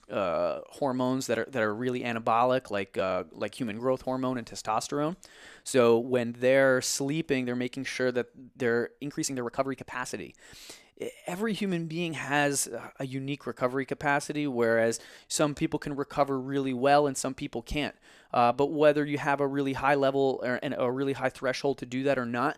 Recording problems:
uneven, jittery; strongly; from 3 to 19 s

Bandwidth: 14 kHz